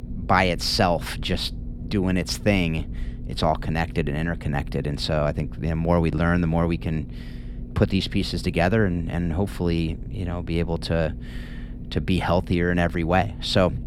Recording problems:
low rumble; faint; throughout; 20 dB below the speech

